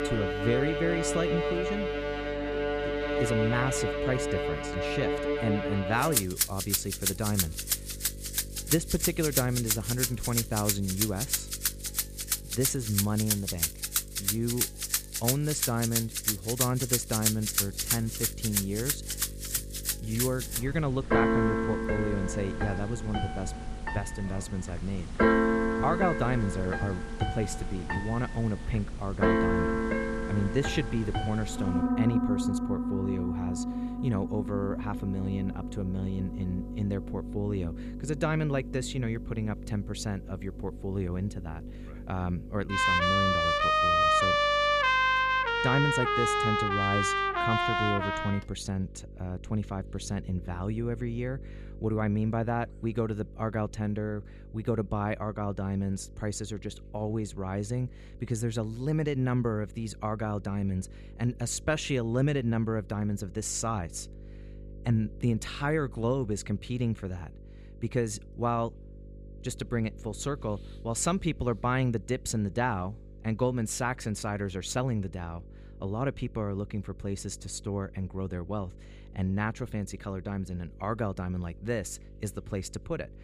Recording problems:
background music; very loud; until 48 s; 3 dB above the speech
electrical hum; noticeable; throughout; 50 Hz, 20 dB below the speech

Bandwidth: 15 kHz